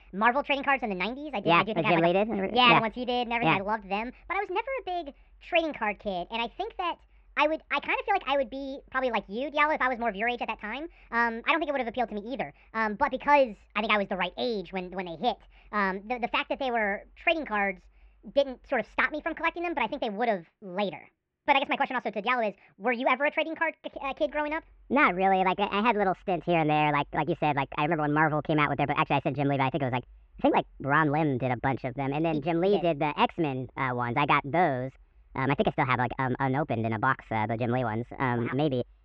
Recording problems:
muffled; very; fading above 2.5 kHz
wrong speed and pitch; too fast and too high; 1.5 times normal speed

